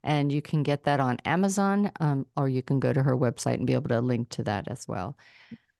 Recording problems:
none

